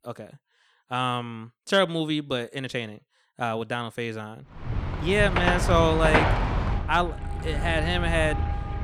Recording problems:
traffic noise; loud; from 4.5 s on; 1 dB below the speech

